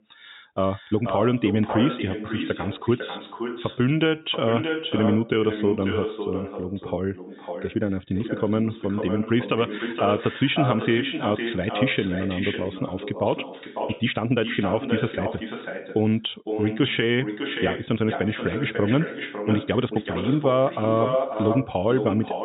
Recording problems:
echo of what is said; strong; throughout; 550 ms later, 6 dB below the speech
high frequencies cut off; severe; nothing above 4 kHz
uneven, jittery; strongly; from 0.5 to 22 s

